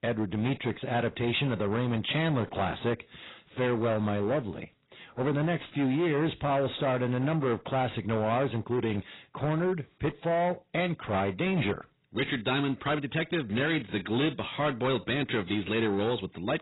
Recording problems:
garbled, watery; badly; nothing above 4 kHz
distortion; slight; 14% of the sound clipped

